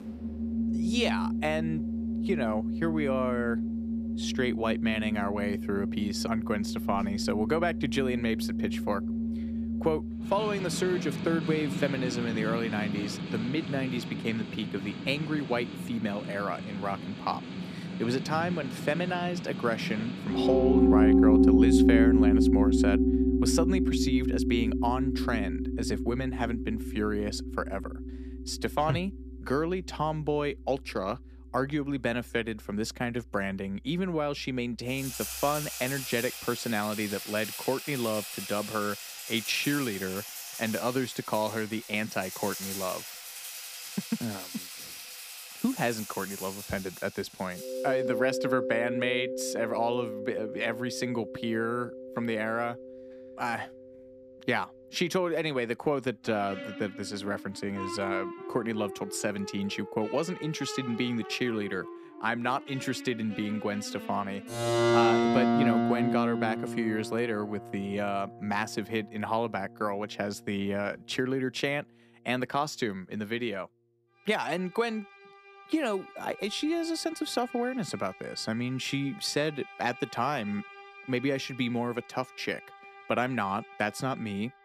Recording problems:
background music; very loud; throughout; 1 dB above the speech

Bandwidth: 15 kHz